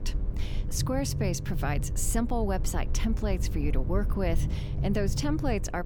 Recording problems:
electrical hum; noticeable; throughout; 50 Hz, 20 dB below the speech
low rumble; noticeable; throughout; 15 dB below the speech

